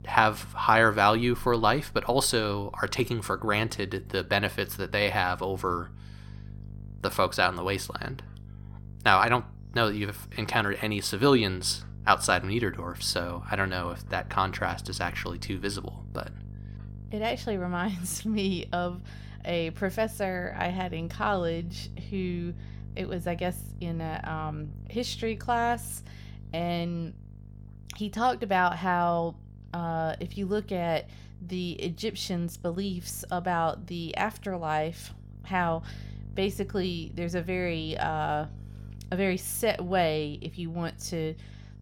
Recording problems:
electrical hum; faint; throughout; 50 Hz, 30 dB below the speech

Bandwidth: 17.5 kHz